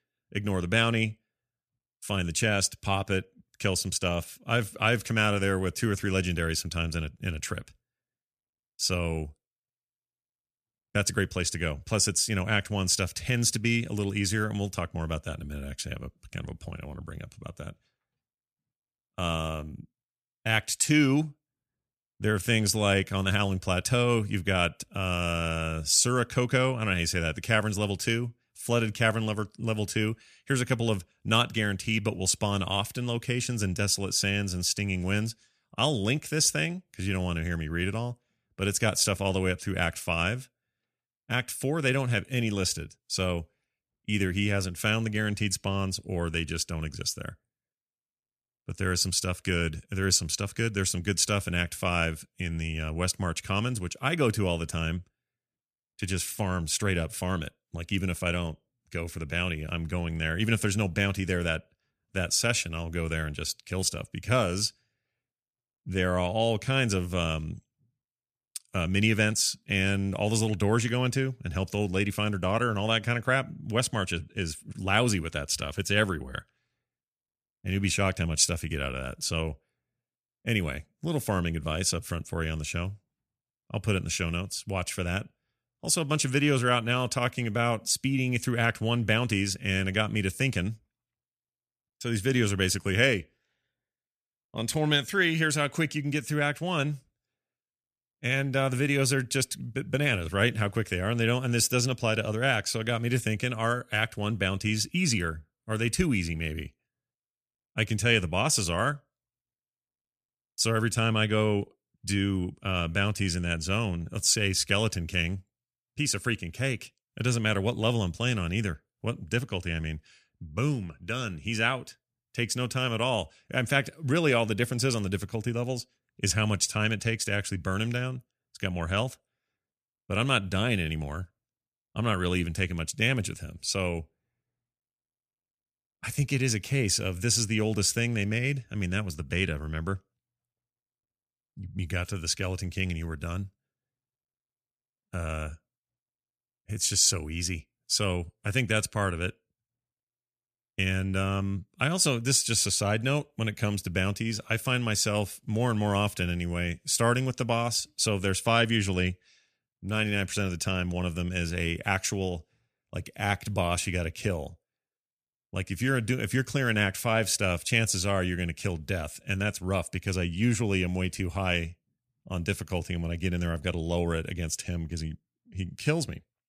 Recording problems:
none

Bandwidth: 14.5 kHz